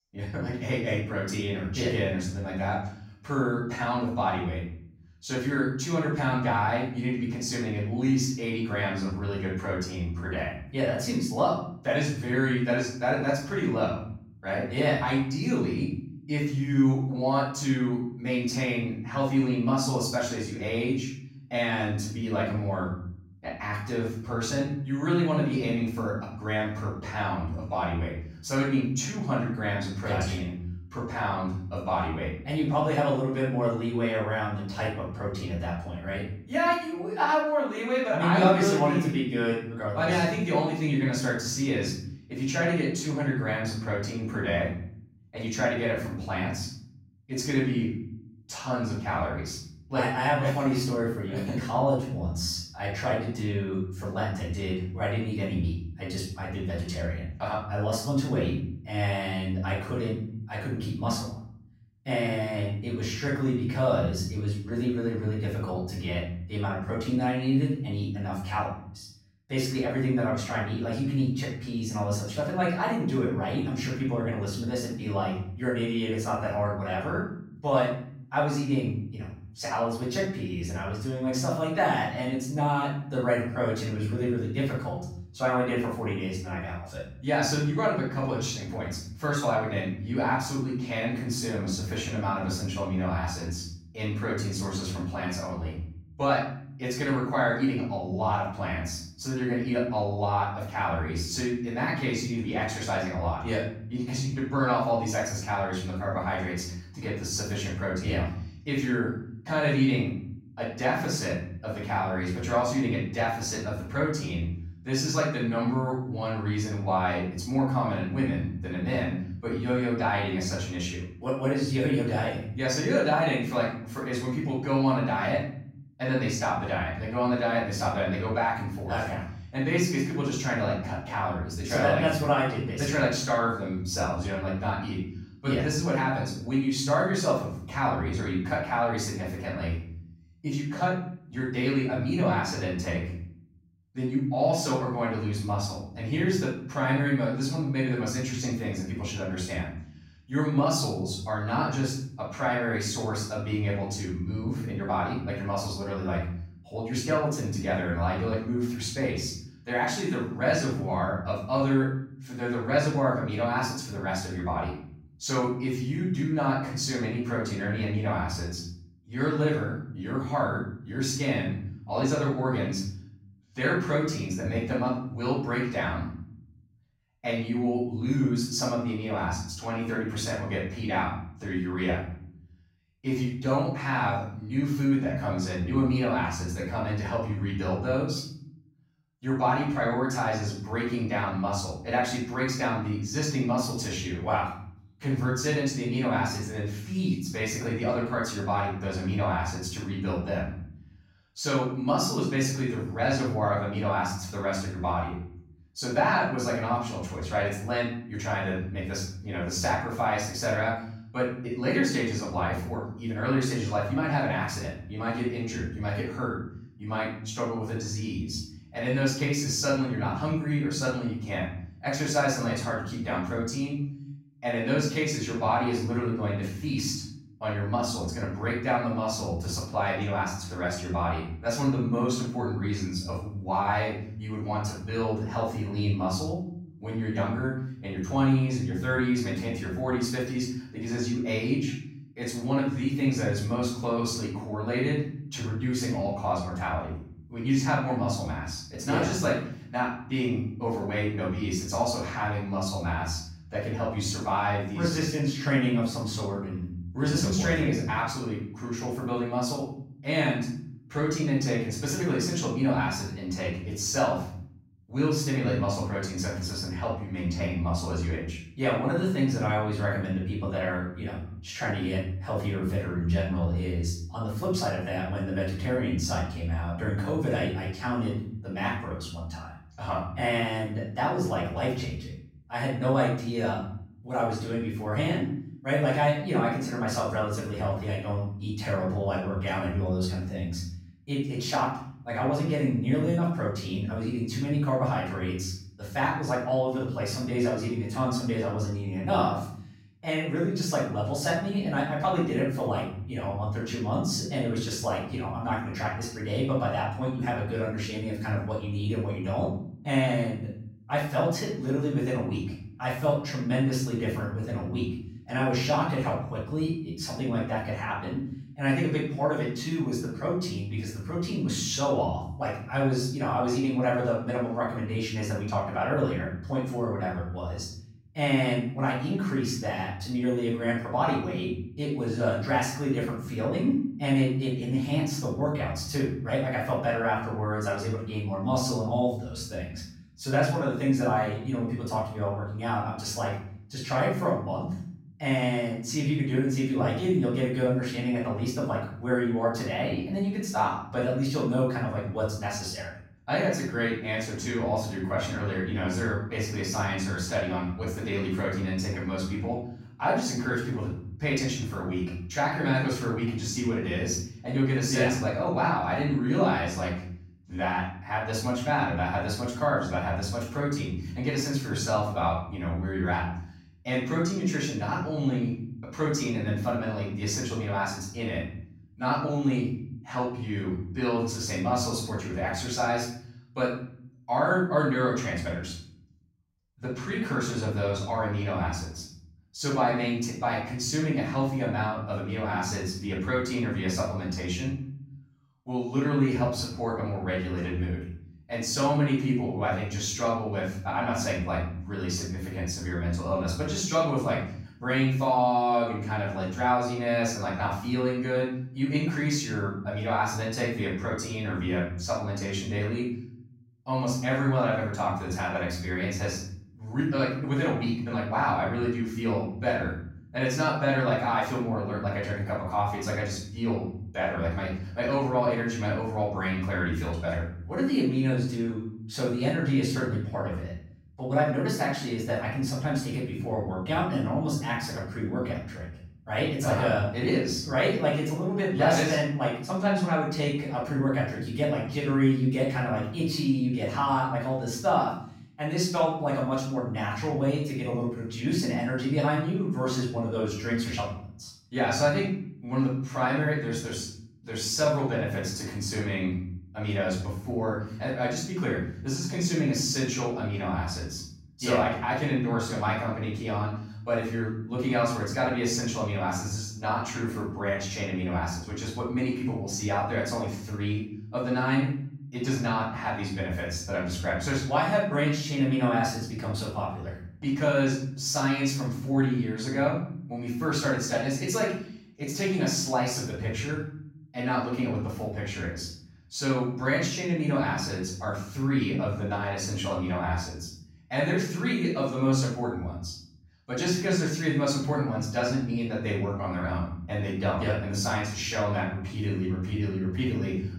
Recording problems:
off-mic speech; far
room echo; noticeable; dies away in 0.8 s

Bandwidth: 16 kHz